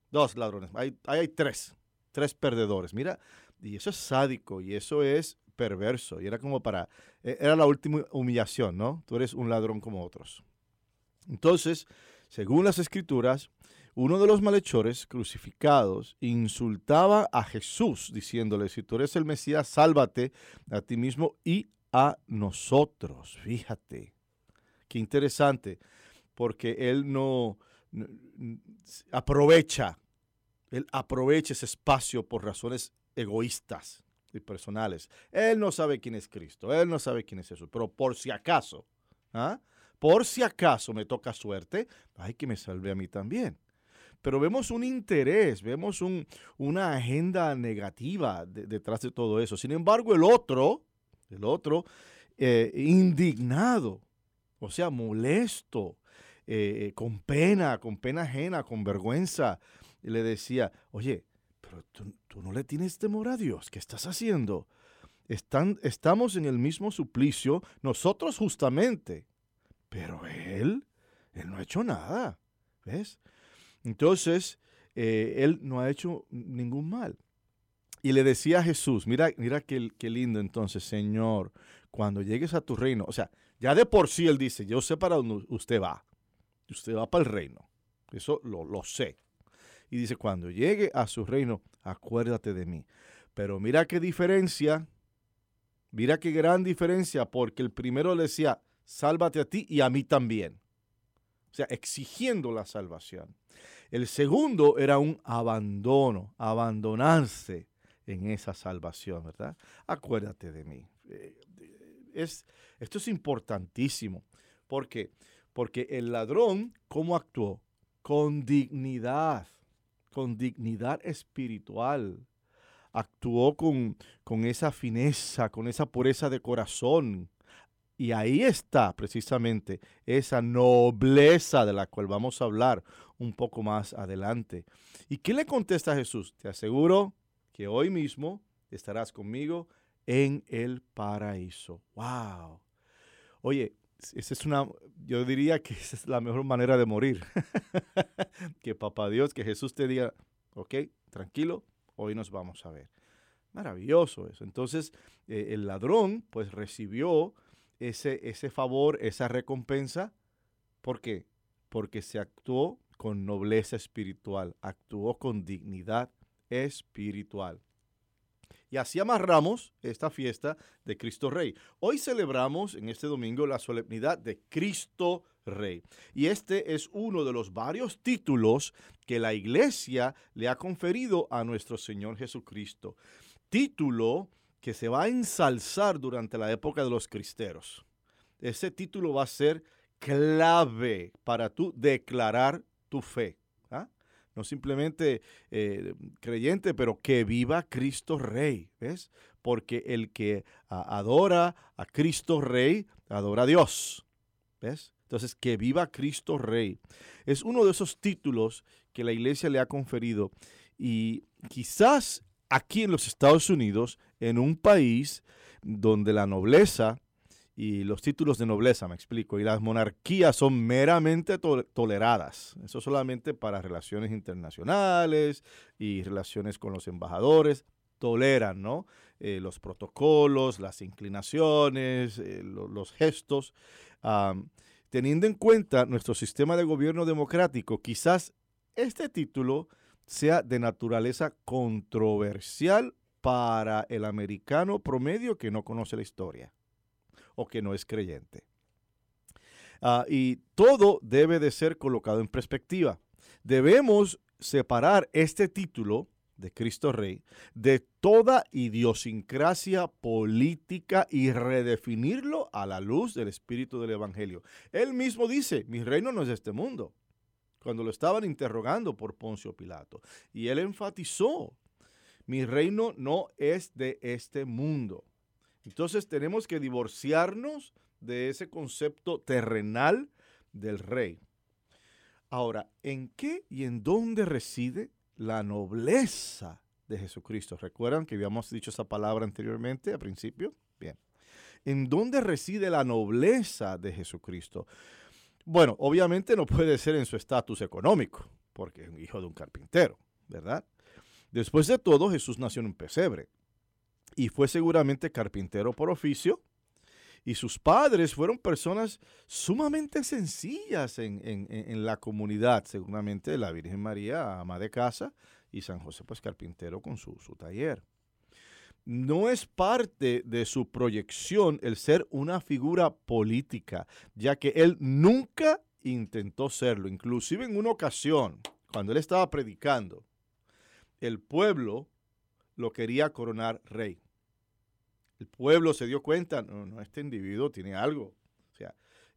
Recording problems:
none

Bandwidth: 18.5 kHz